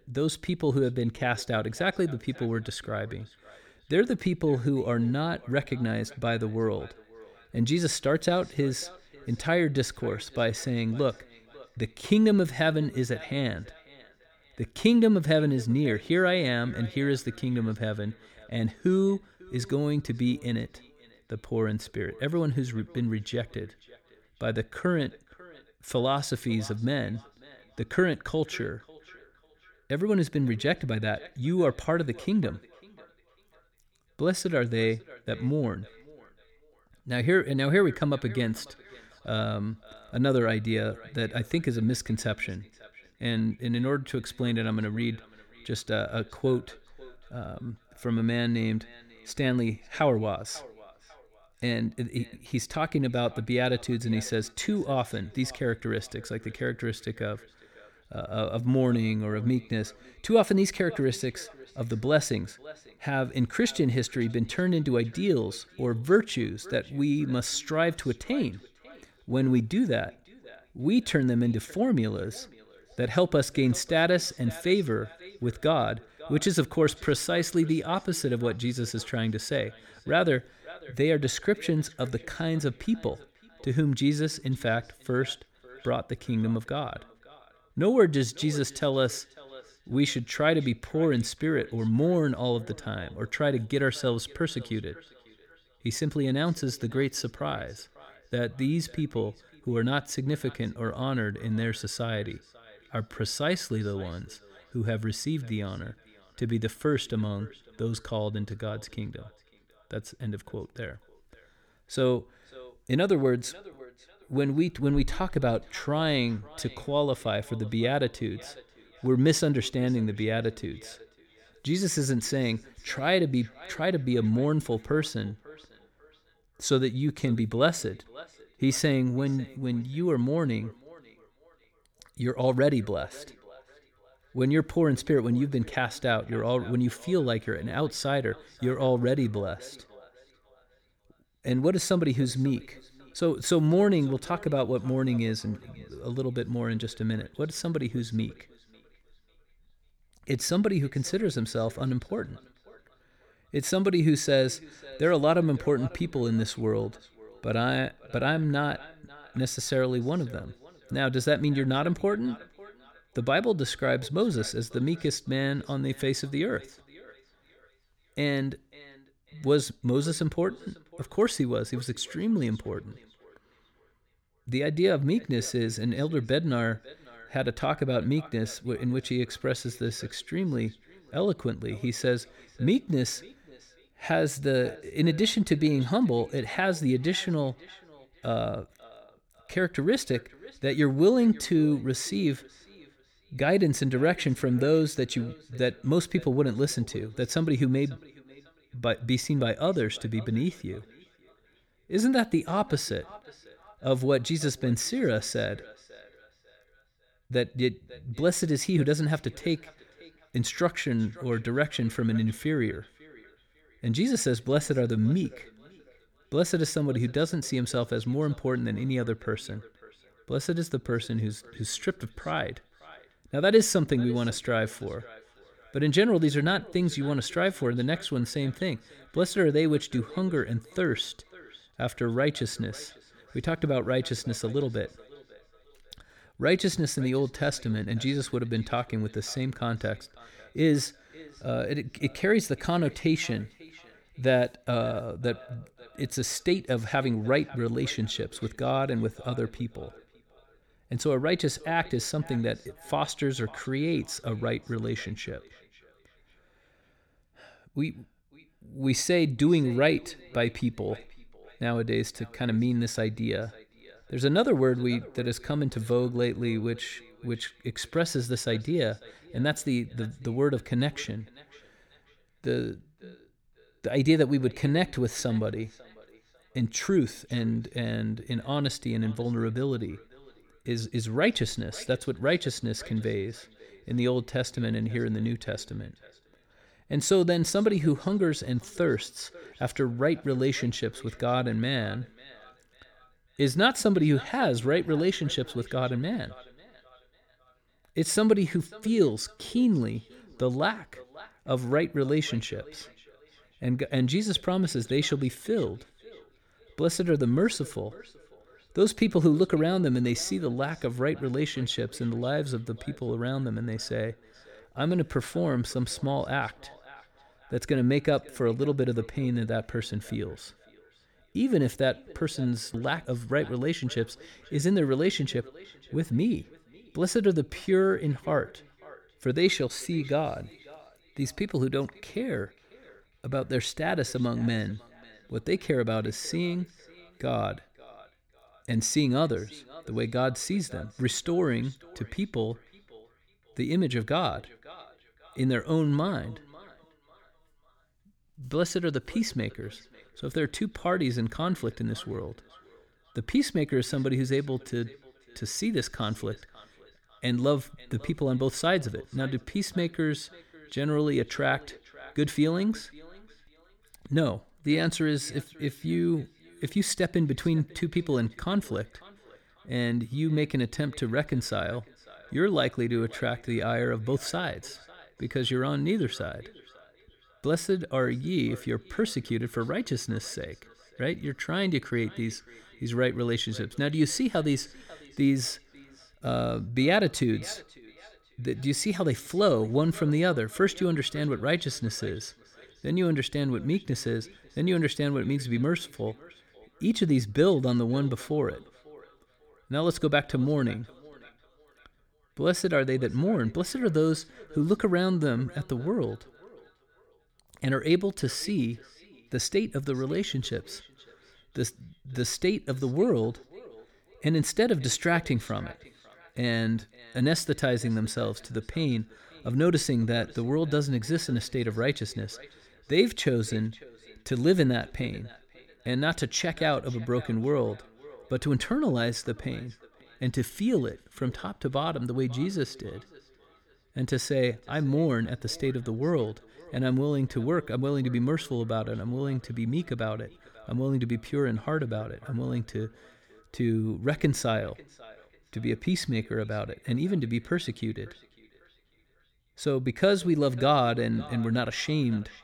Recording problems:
echo of what is said; faint; throughout; 550 ms later, 25 dB below the speech

